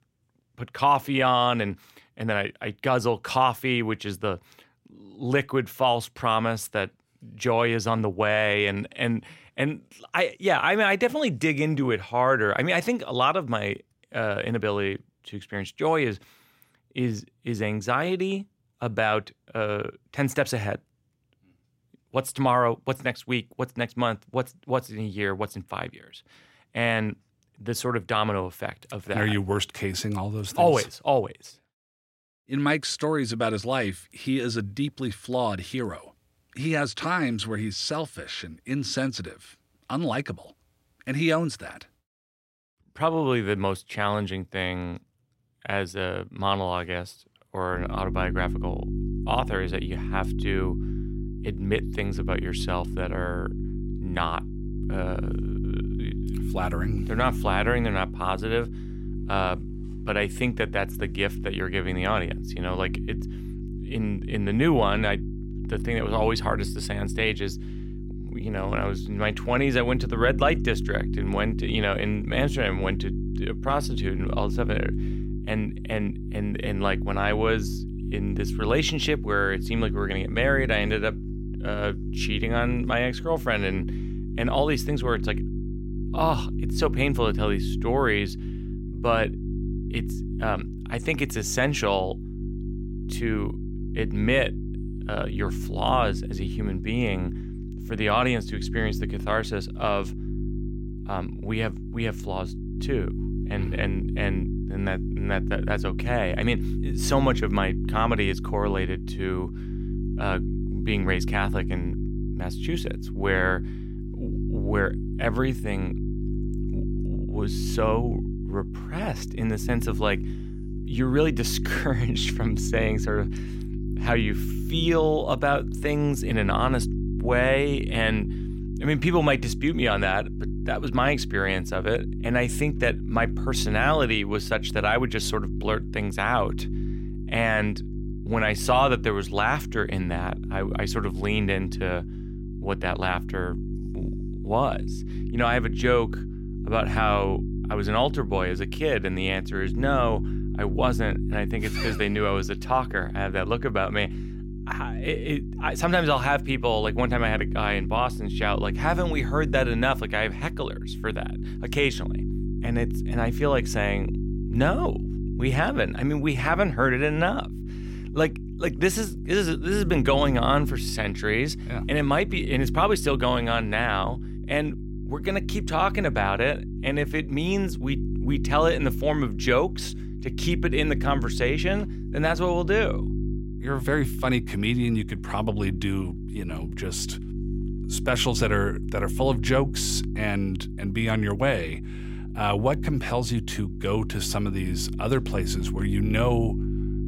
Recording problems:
electrical hum; noticeable; from 48 s on; 50 Hz, 15 dB below the speech

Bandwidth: 16 kHz